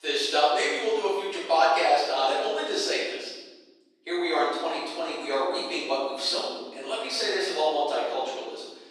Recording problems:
room echo; strong; dies away in 1.3 s
off-mic speech; far
thin; very; fading below 400 Hz

